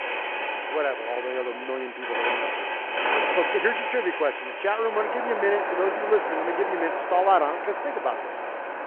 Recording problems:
phone-call audio
traffic noise; loud; throughout; 1 dB below the speech

